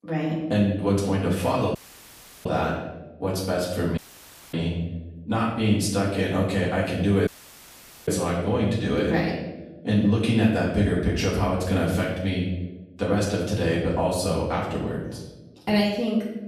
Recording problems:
off-mic speech; far
room echo; noticeable; dies away in 0.9 s
audio cutting out; at 2 s for 0.5 s, at 4 s for 0.5 s and at 7.5 s for 1 s

